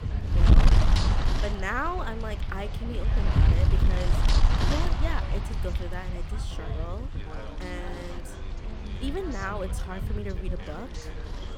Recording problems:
wind noise on the microphone; heavy; 1 dB below the speech
background chatter; loud; throughout; 4 voices, 9 dB below the speech

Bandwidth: 18.5 kHz